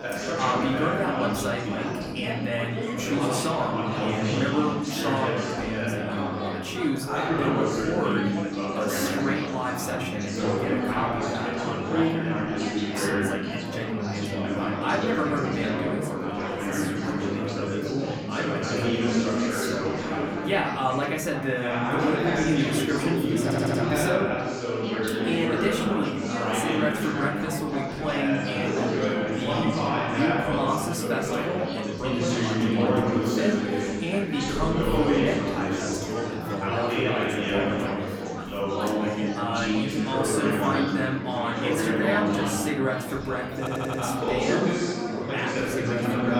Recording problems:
off-mic speech; far
room echo; slight; dies away in 0.5 s
chatter from many people; very loud; throughout; 2 dB above the speech
audio stuttering; at 23 s and at 44 s

